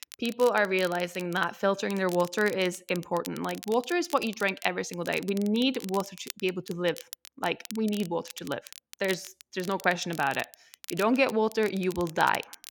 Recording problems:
crackle, like an old record; noticeable; 15 dB below the speech

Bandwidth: 17.5 kHz